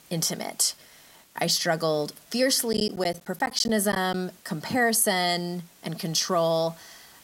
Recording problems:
hiss; faint; throughout; 25 dB below the speech
choppy; very; from 2.5 to 4 s; 11% of the speech affected

